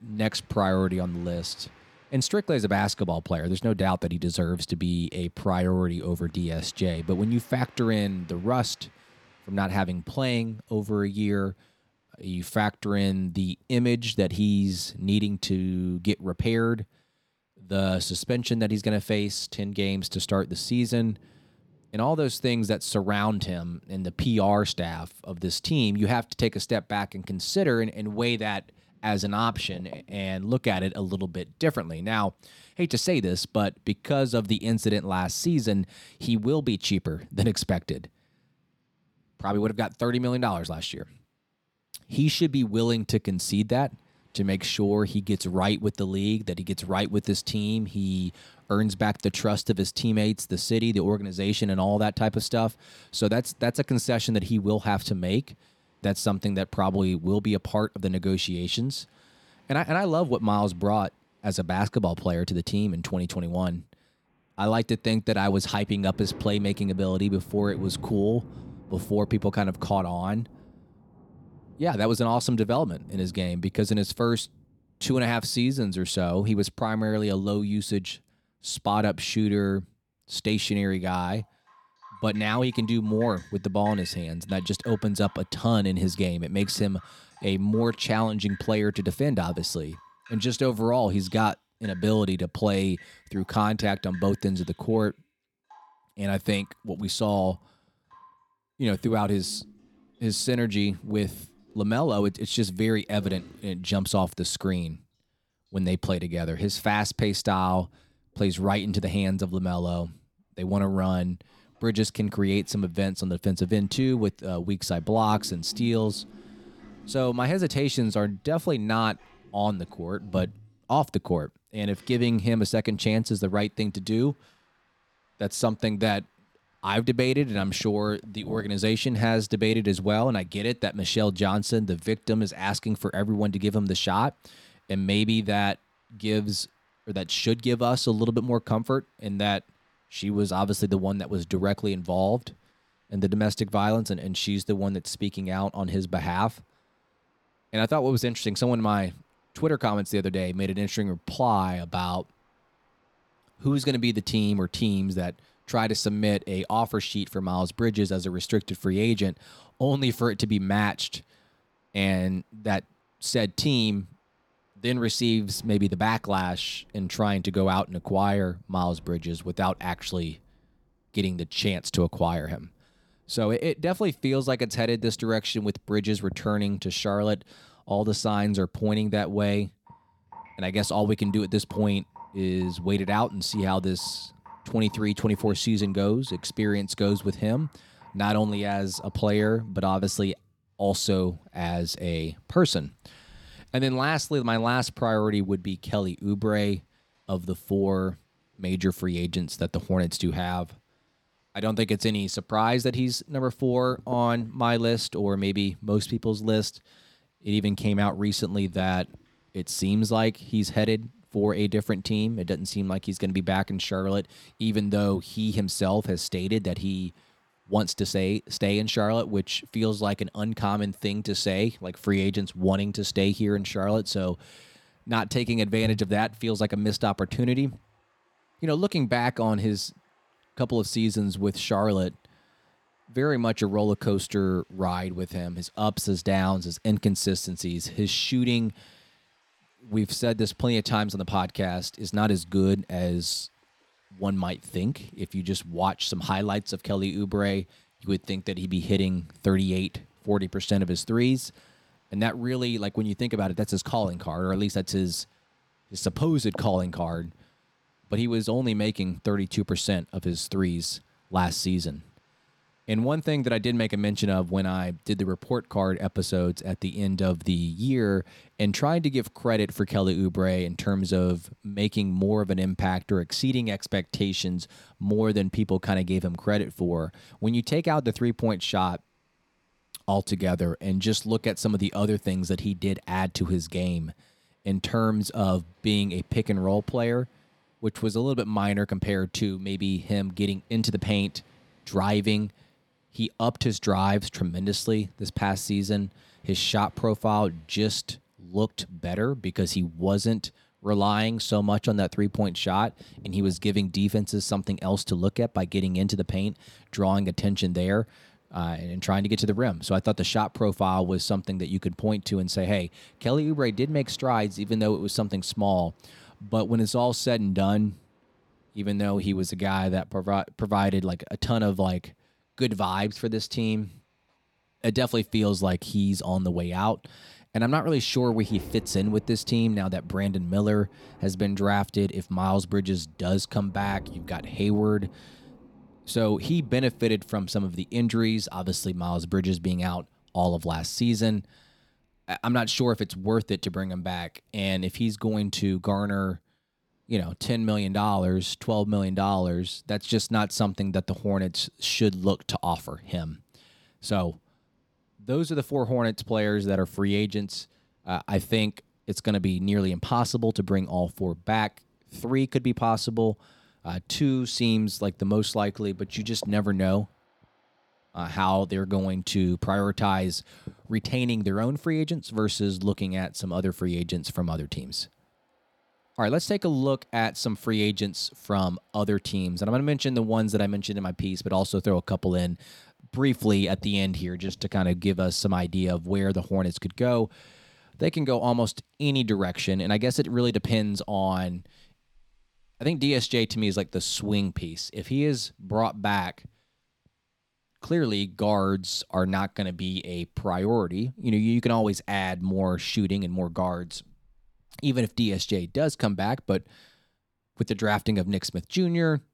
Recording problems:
rain or running water; faint; throughout; 25 dB below the speech

